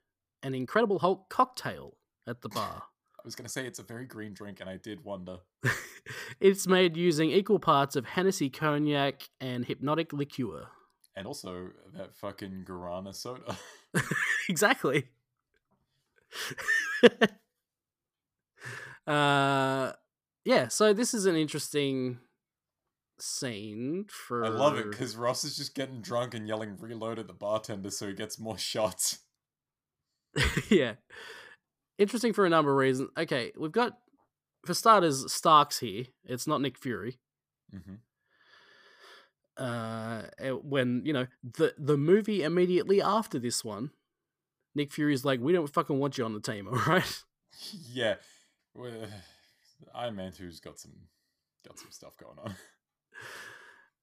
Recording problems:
uneven, jittery; strongly; from 0.5 to 51 s

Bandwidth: 15 kHz